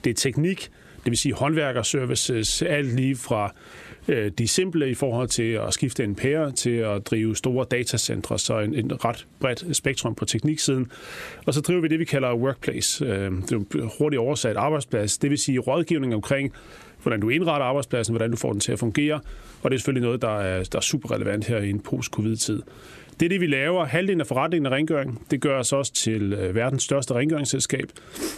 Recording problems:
squashed, flat; heavily

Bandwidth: 14 kHz